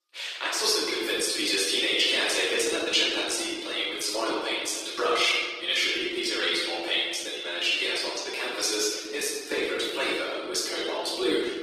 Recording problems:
off-mic speech; far
thin; very; fading below 300 Hz
room echo; noticeable; dies away in 1.5 s
garbled, watery; slightly

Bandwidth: 15 kHz